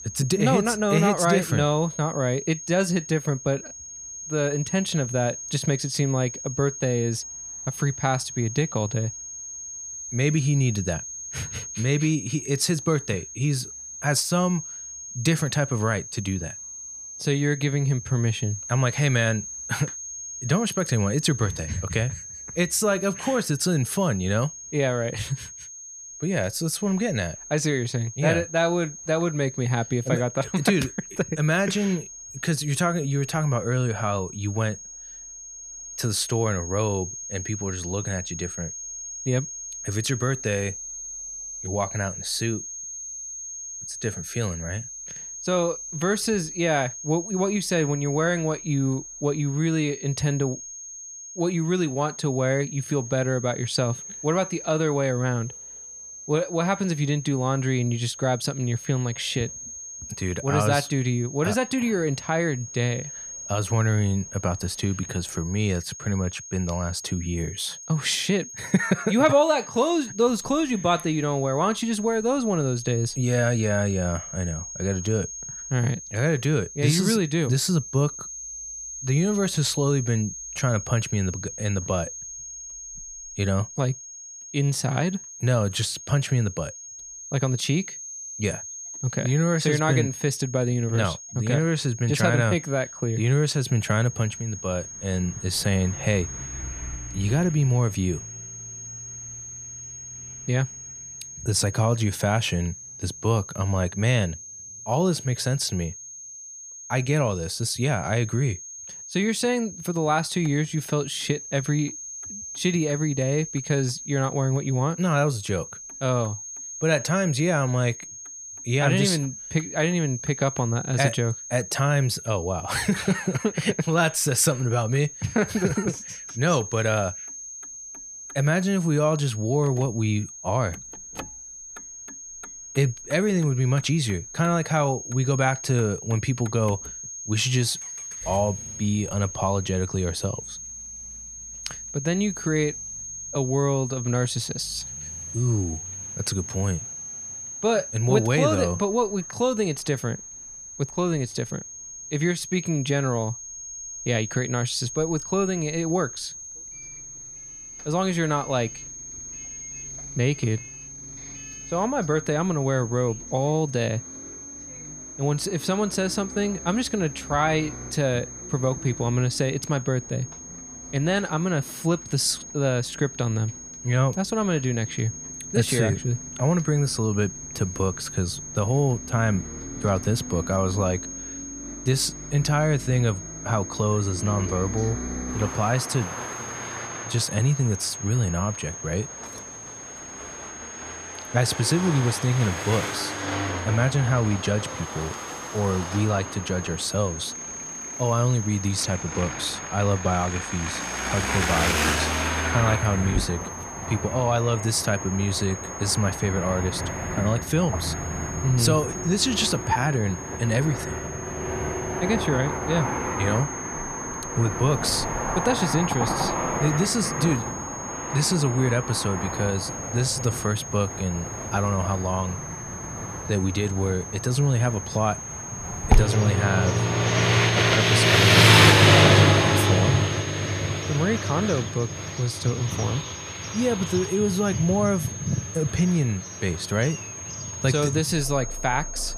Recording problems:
high-pitched whine; loud; throughout; 6.5 kHz, 10 dB below the speech
traffic noise; loud; throughout; 2 dB below the speech

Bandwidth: 15 kHz